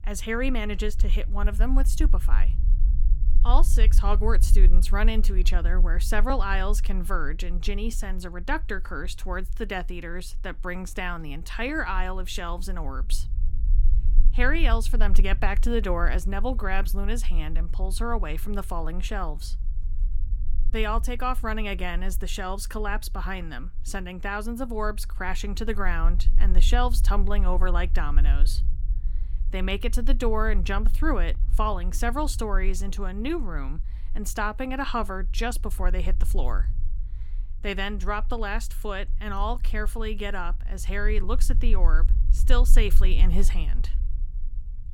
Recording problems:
low rumble; faint; throughout; 20 dB below the speech

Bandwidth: 17.5 kHz